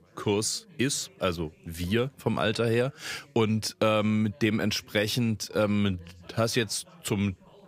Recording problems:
background chatter; faint; throughout; 4 voices, 25 dB below the speech

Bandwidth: 15.5 kHz